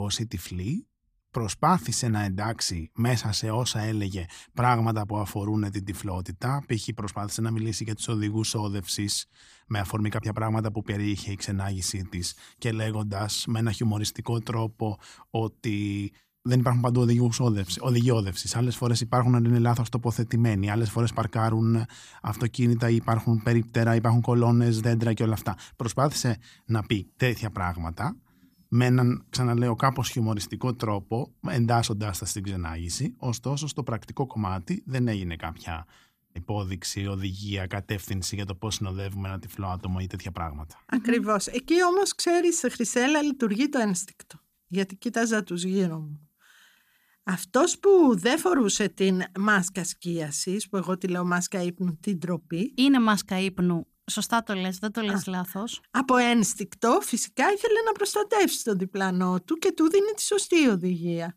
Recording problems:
abrupt cut into speech; at the start

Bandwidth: 15 kHz